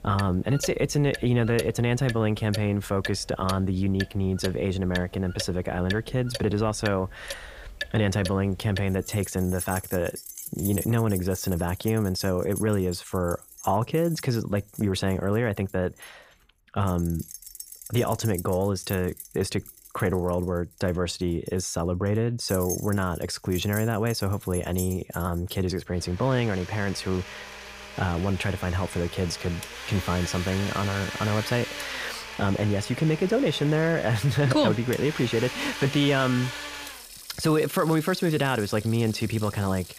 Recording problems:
household noises; noticeable; throughout; 10 dB below the speech

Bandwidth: 15 kHz